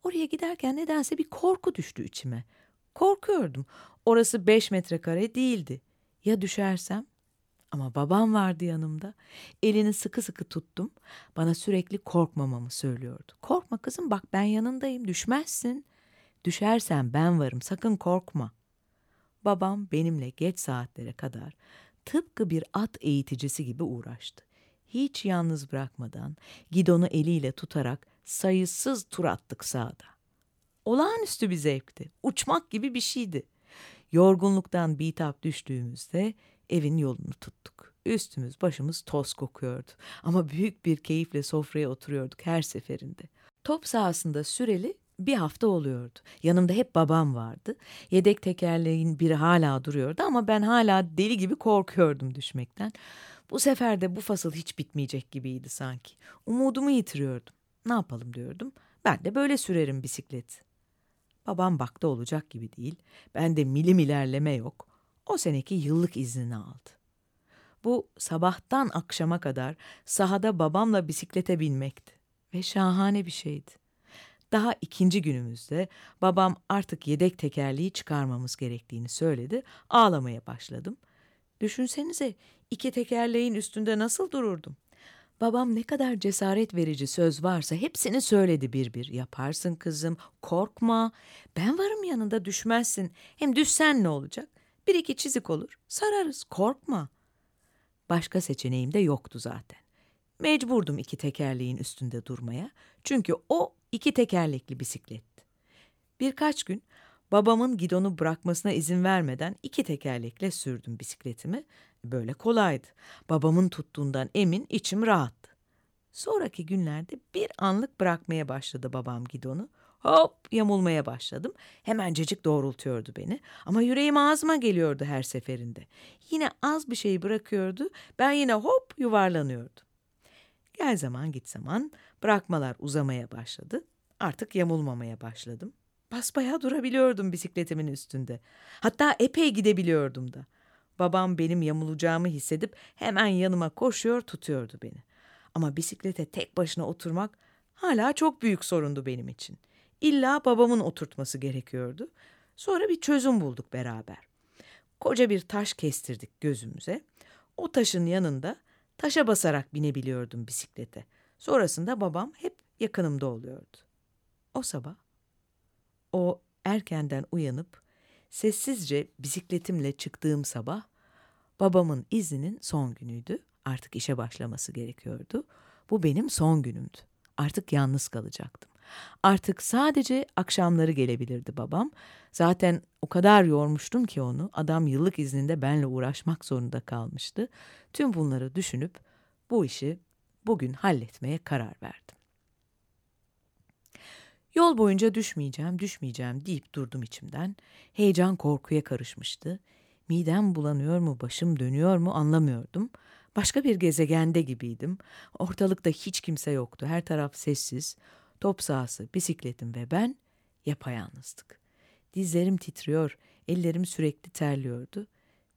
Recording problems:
none

